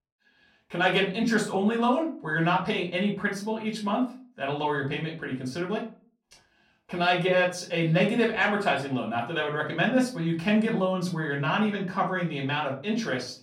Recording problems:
off-mic speech; far
room echo; slight; dies away in 0.3 s

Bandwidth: 16 kHz